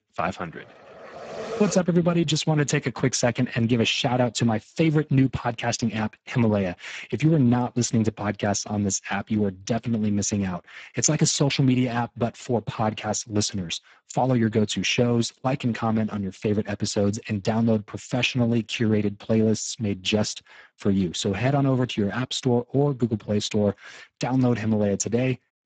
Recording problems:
garbled, watery; badly; nothing above 7.5 kHz

